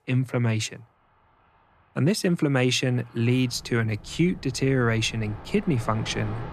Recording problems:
train or aircraft noise; noticeable; throughout; 20 dB below the speech

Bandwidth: 13.5 kHz